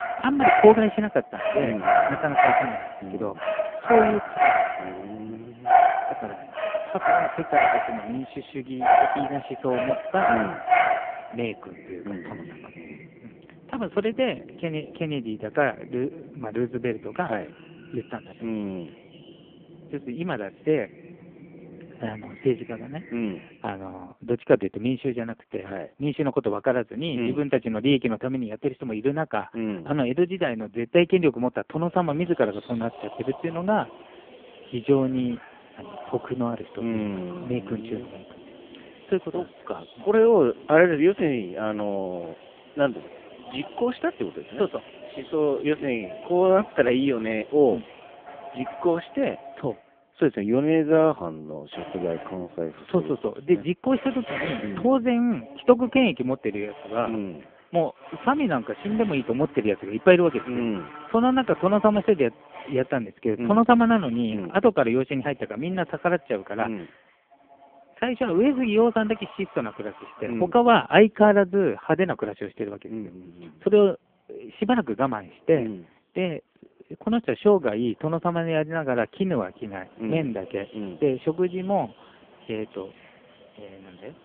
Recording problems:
phone-call audio; poor line
animal sounds; loud; throughout; 1 dB below the speech

